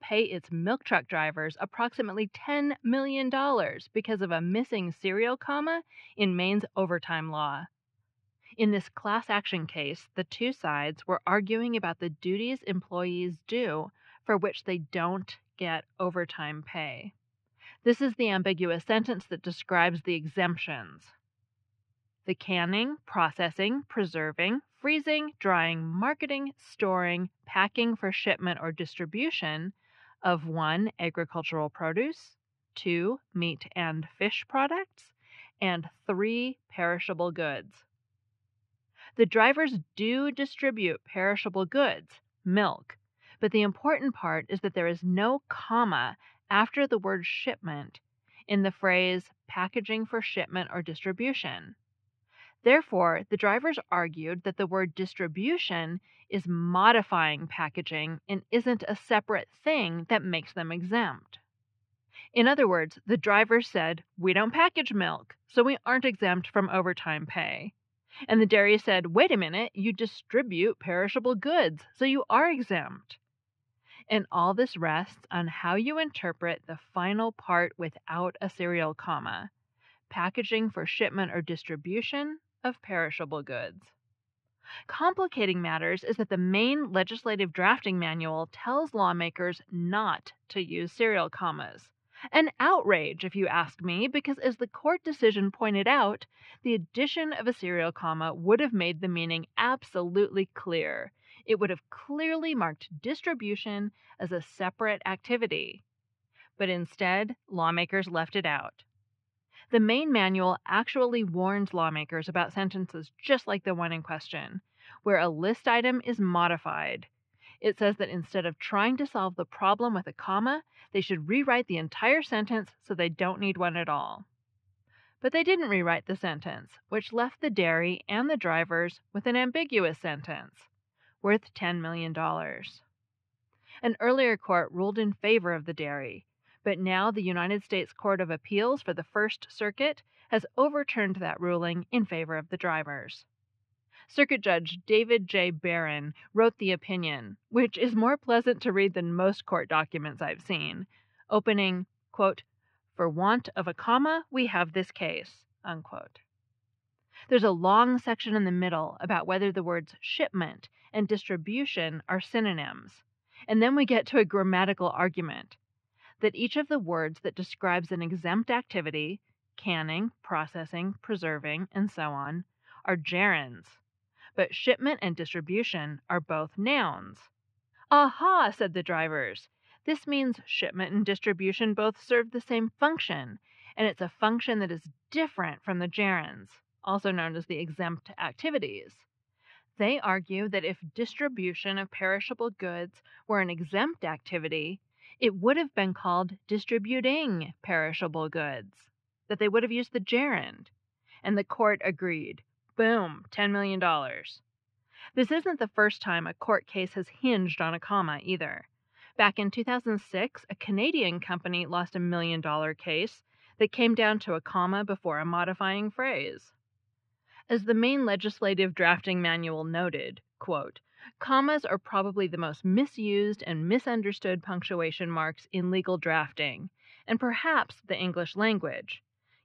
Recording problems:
muffled; very; fading above 3 kHz

